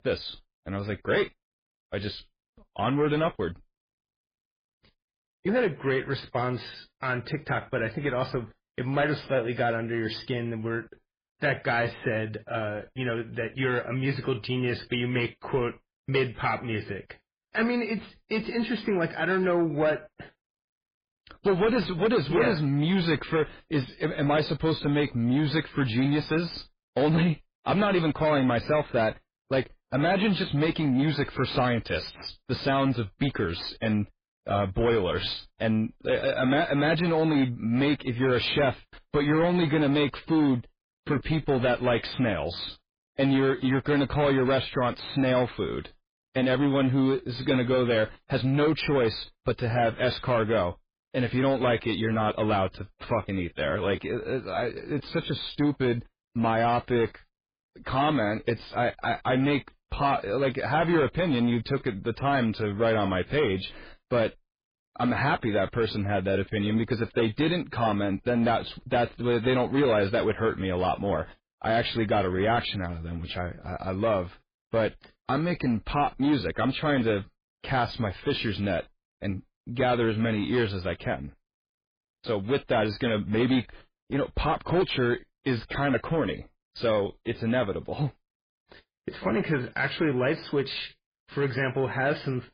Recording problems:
garbled, watery; badly; nothing above 4 kHz
distortion; slight; 10 dB below the speech

